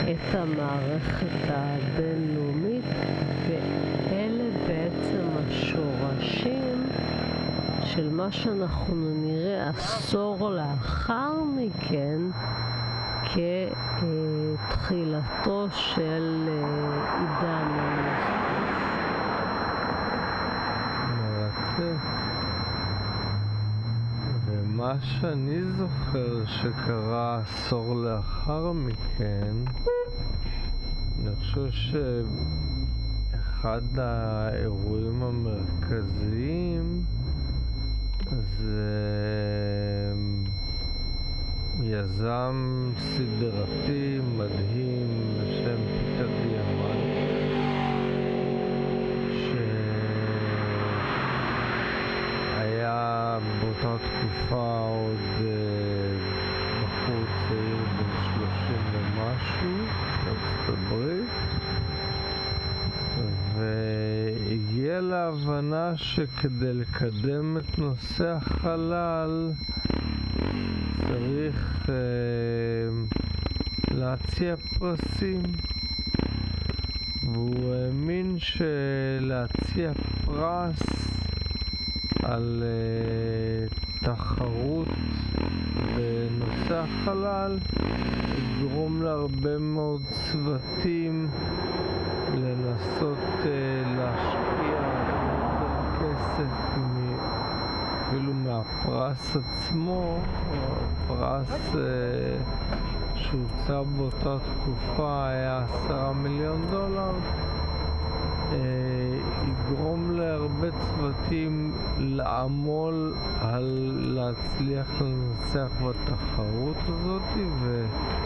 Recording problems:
squashed, flat; heavily, background pumping
wrong speed, natural pitch; too slow; 0.5 times normal speed
muffled; very slightly; fading above 2.5 kHz
high-pitched whine; loud; throughout; 4 kHz, 9 dB below the speech
traffic noise; loud; throughout; 2 dB below the speech

